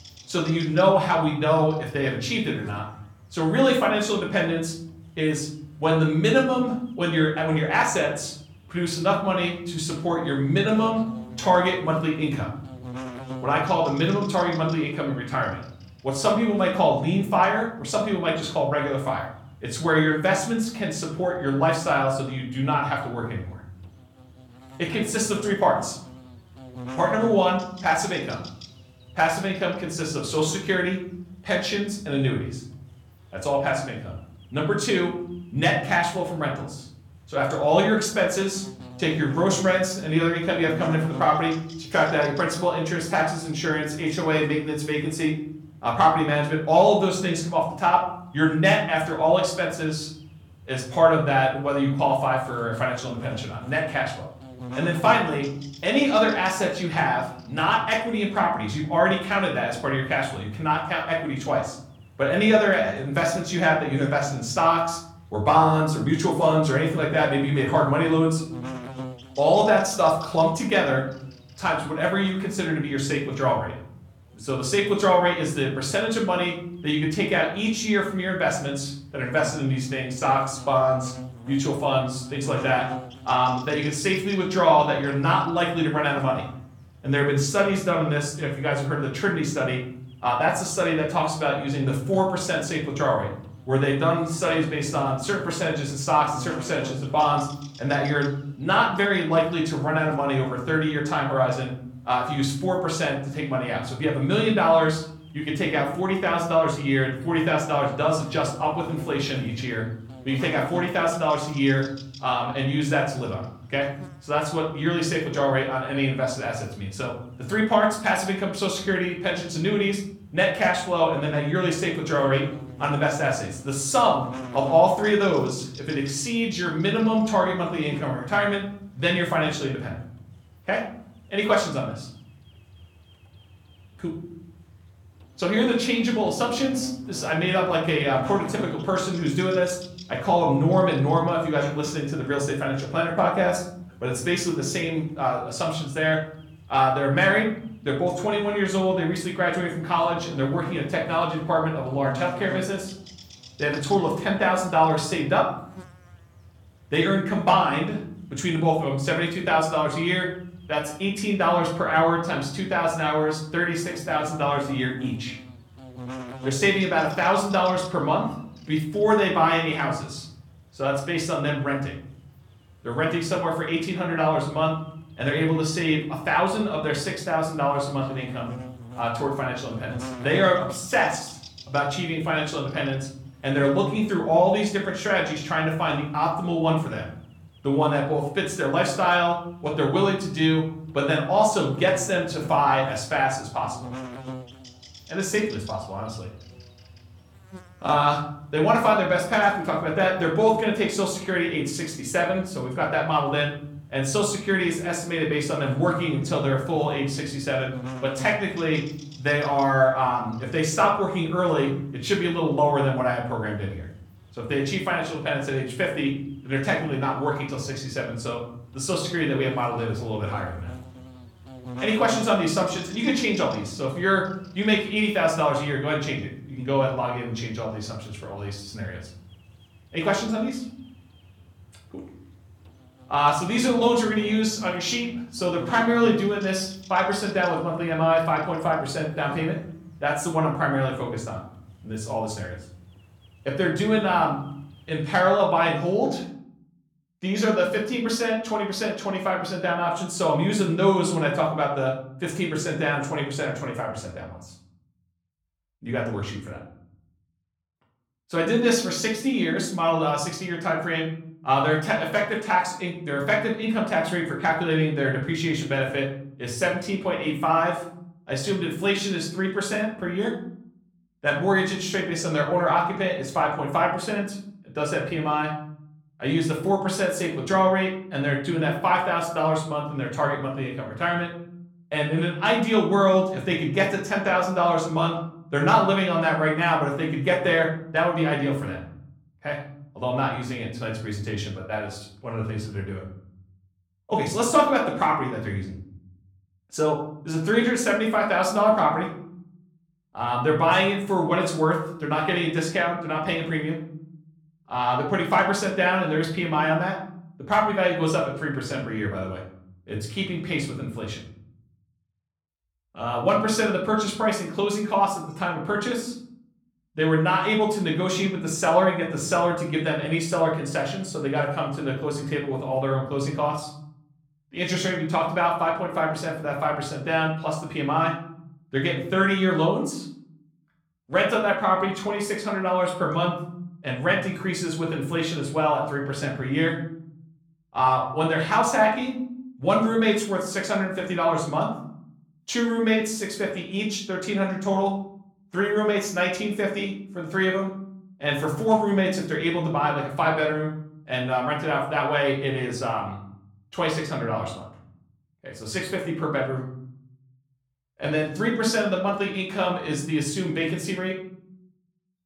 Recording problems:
off-mic speech; far
room echo; slight; dies away in 0.7 s
electrical hum; faint; until 4:05; 60 Hz, 20 dB below the speech

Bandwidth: 18 kHz